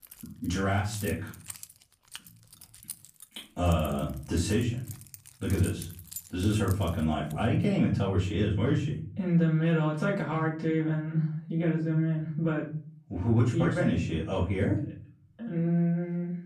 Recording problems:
off-mic speech; far
room echo; slight; dies away in 0.5 s
jangling keys; faint; until 7.5 s; peak 10 dB below the speech

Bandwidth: 15 kHz